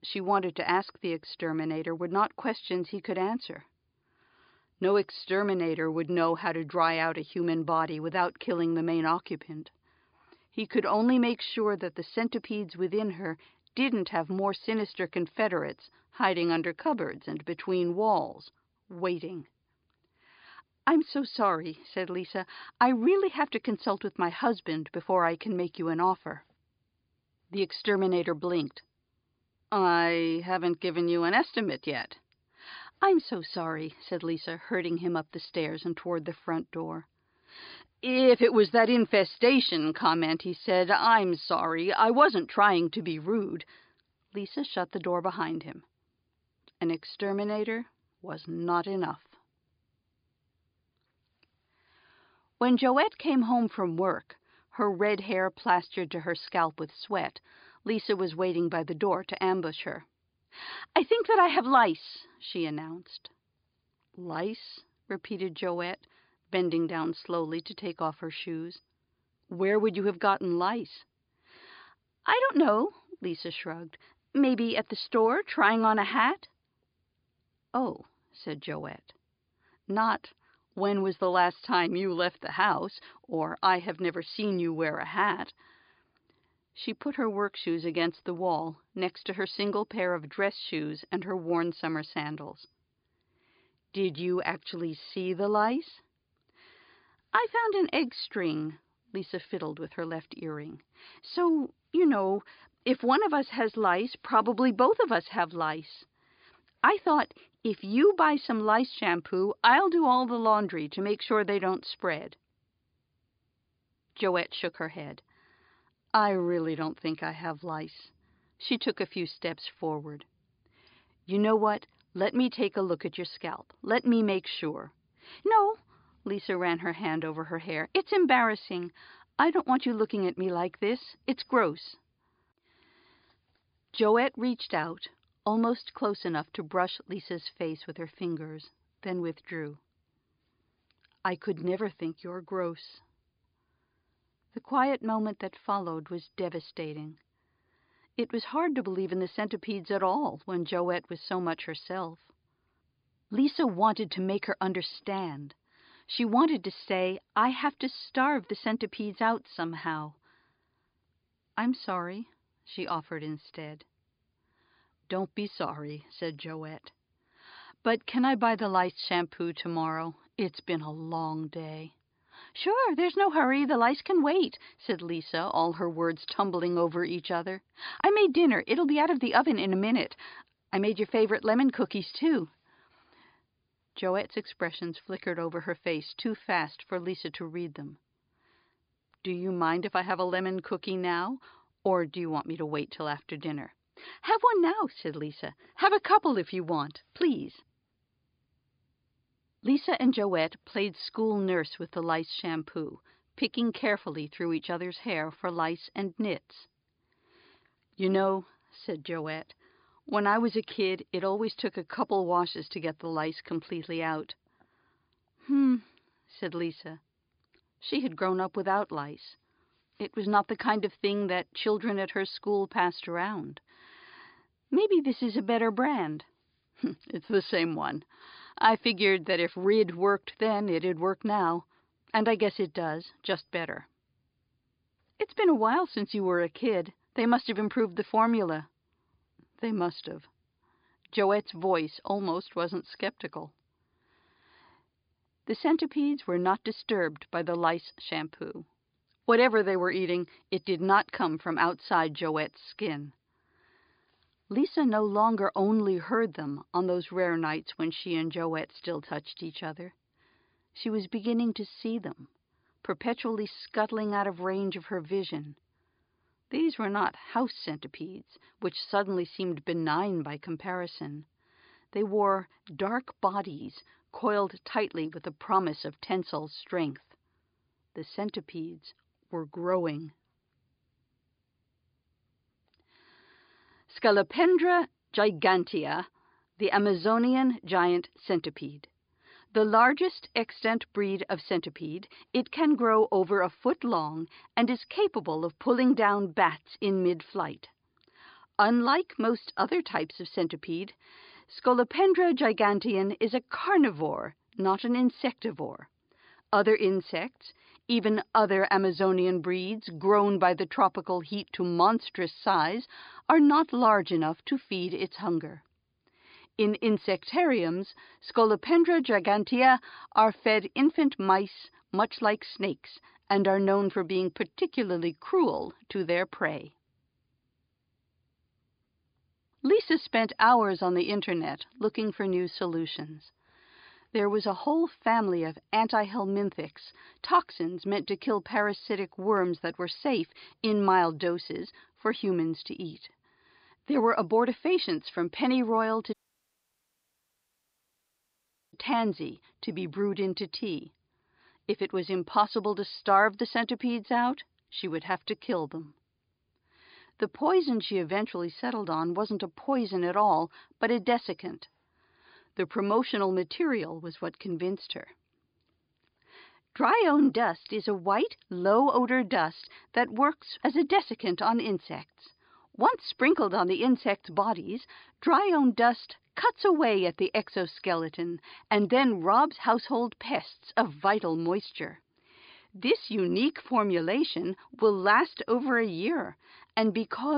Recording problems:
high frequencies cut off; severe; nothing above 5 kHz
audio cutting out; at 5:46 for 2.5 s
abrupt cut into speech; at the end

